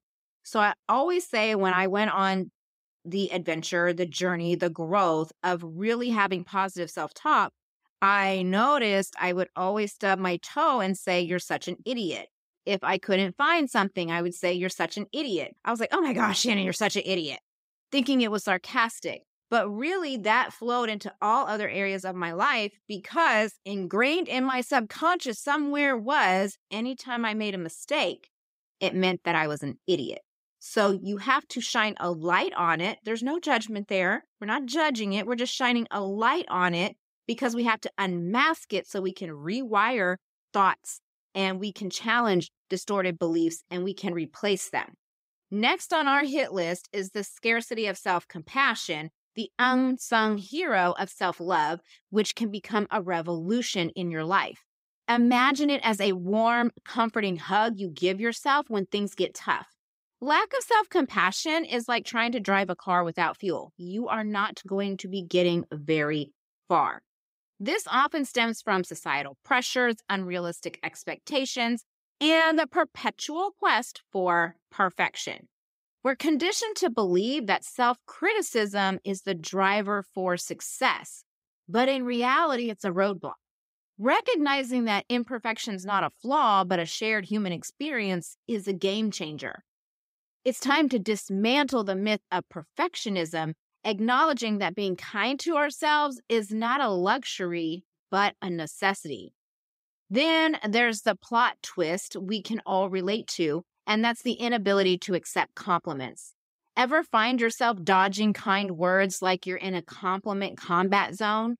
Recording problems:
none

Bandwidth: 15.5 kHz